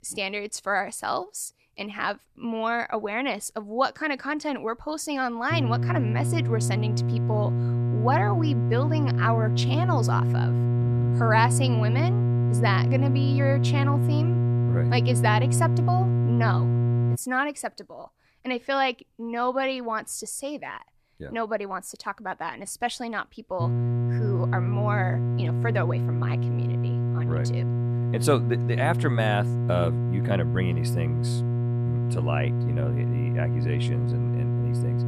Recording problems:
electrical hum; loud; from 5.5 to 17 s and from 24 s on; 60 Hz, 6 dB below the speech

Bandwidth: 14.5 kHz